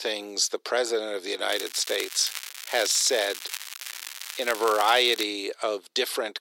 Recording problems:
thin; very; fading below 350 Hz
crackling; noticeable; from 1.5 to 5 s; 10 dB below the speech

